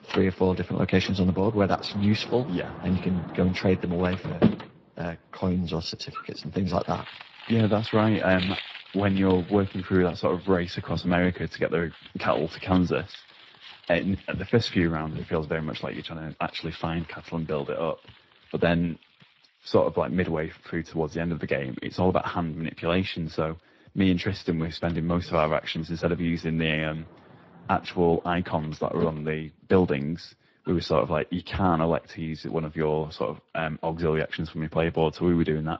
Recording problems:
garbled, watery; slightly
household noises; noticeable; throughout; 10 dB below the speech

